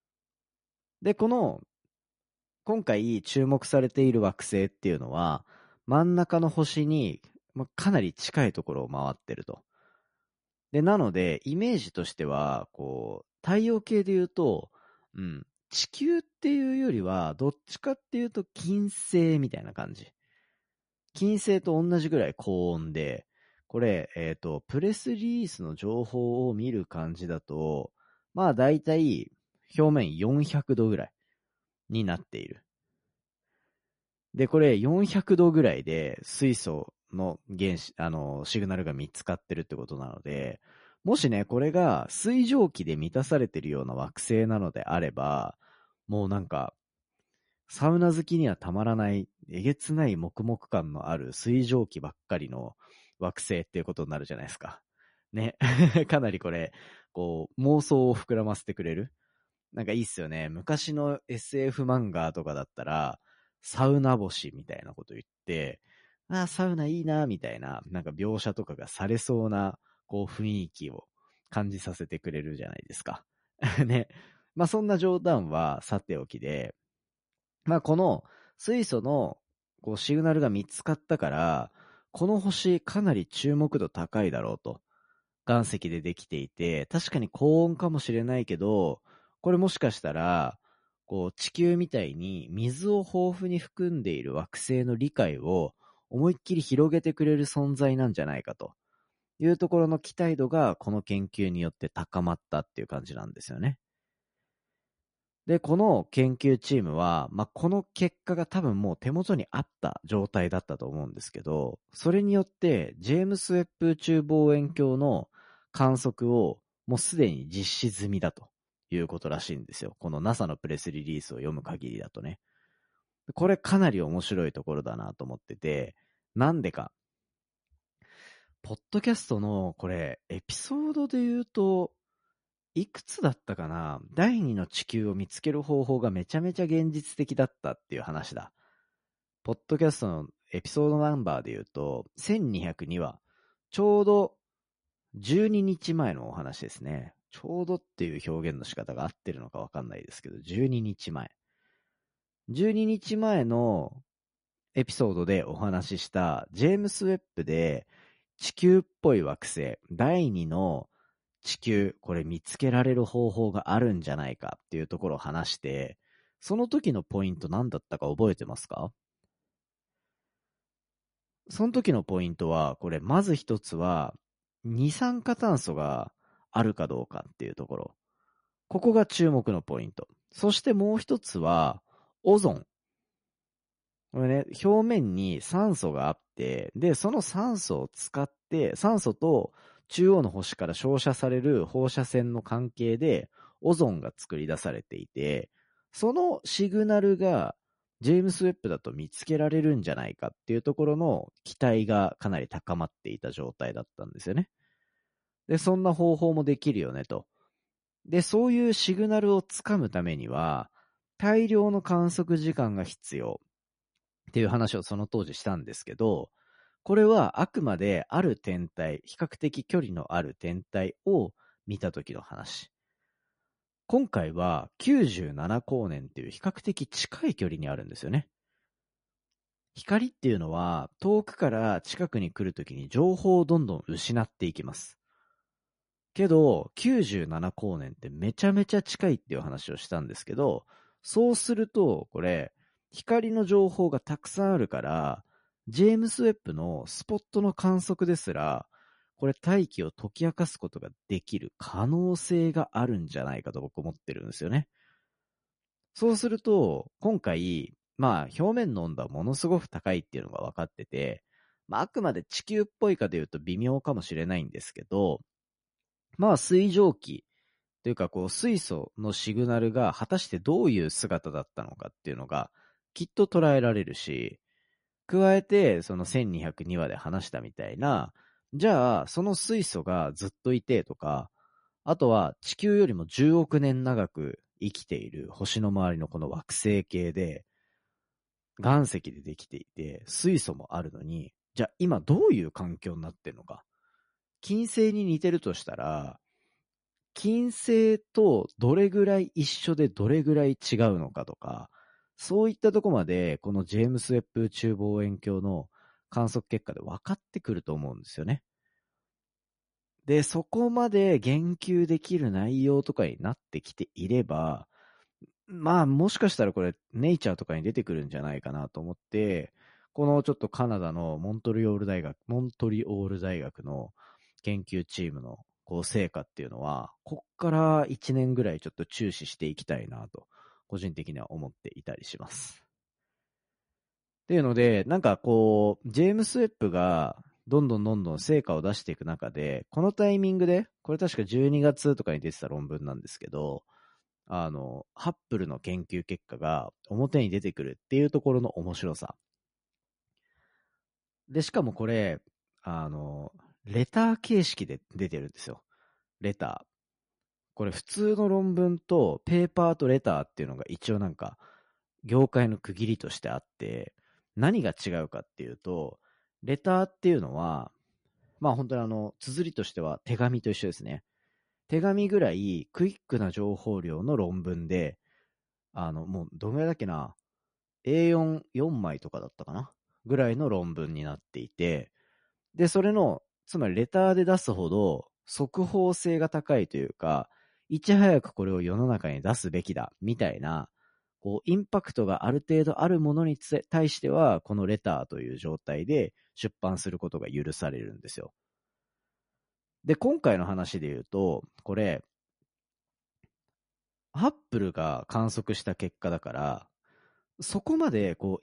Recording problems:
garbled, watery; slightly; nothing above 10.5 kHz

